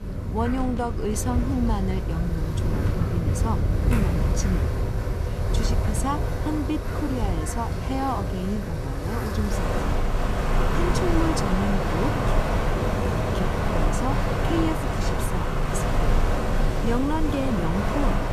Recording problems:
wind in the background; very loud; throughout; 4 dB above the speech

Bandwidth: 14.5 kHz